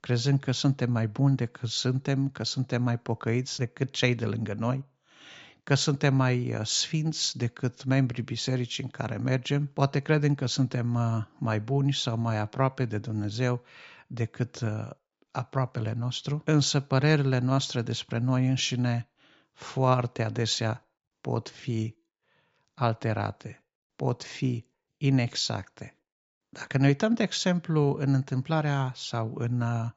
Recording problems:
high frequencies cut off; noticeable; nothing above 8 kHz

